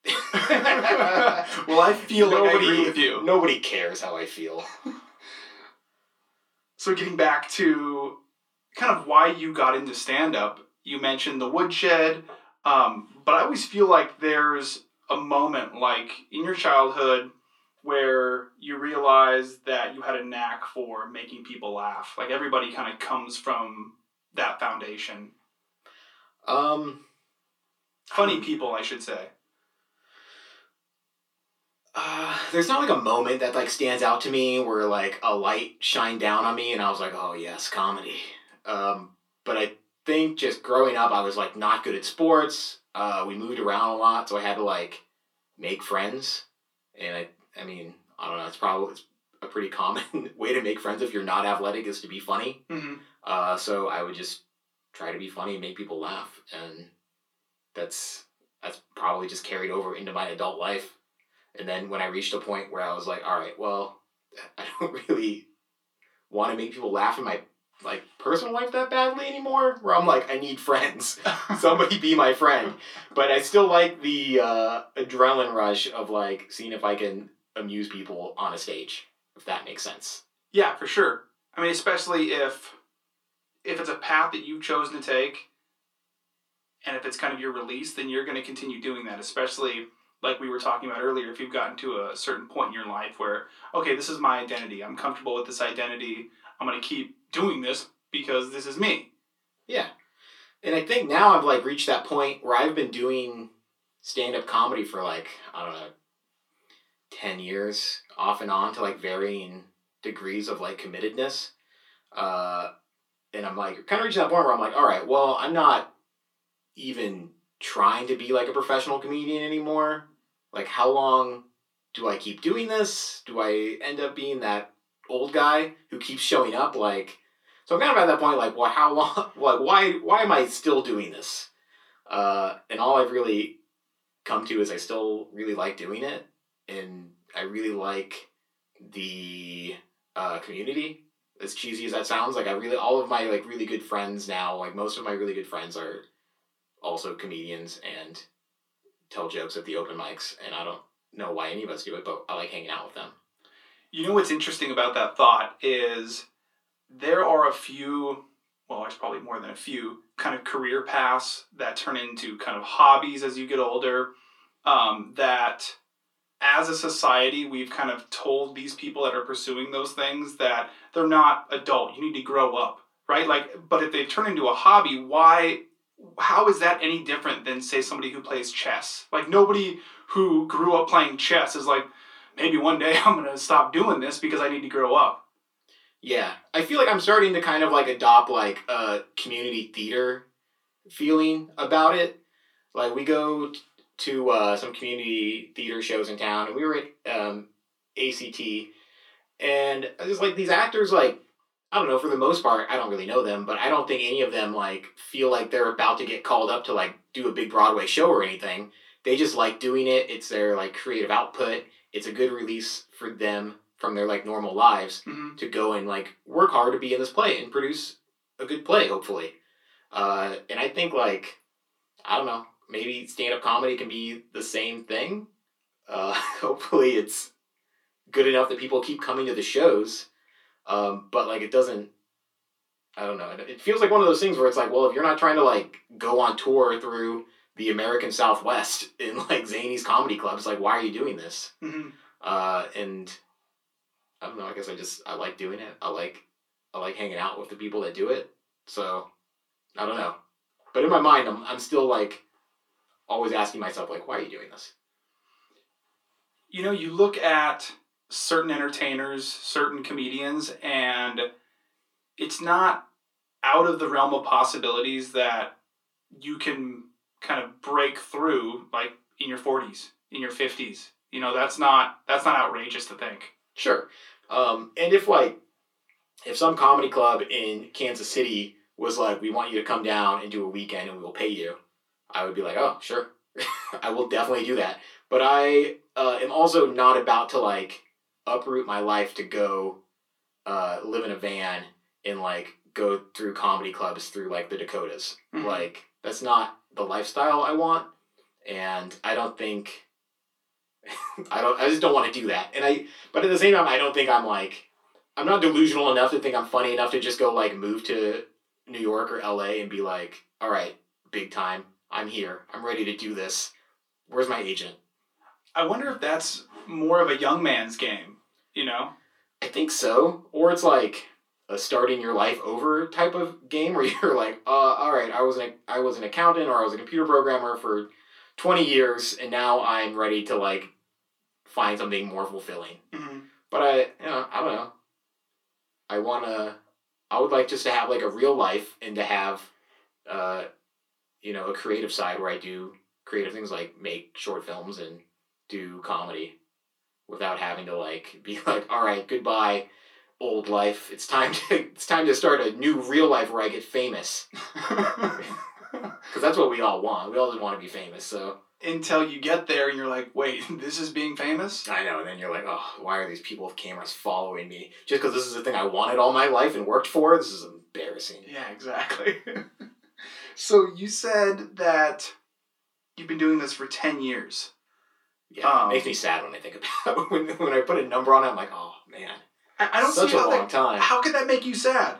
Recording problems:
off-mic speech; far
thin; somewhat; fading below 300 Hz
room echo; very slight; dies away in 0.2 s

